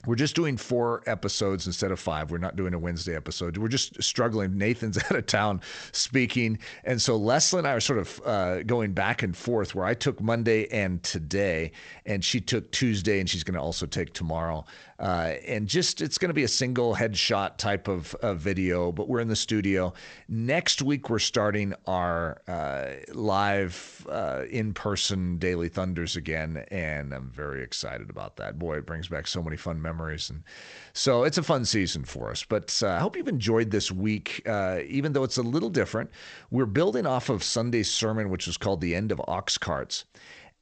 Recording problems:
garbled, watery; slightly; nothing above 7.5 kHz

